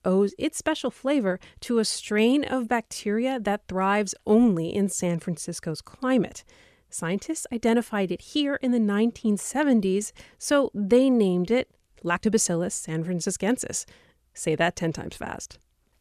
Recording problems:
uneven, jittery; strongly; from 2 to 12 s

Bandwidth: 14.5 kHz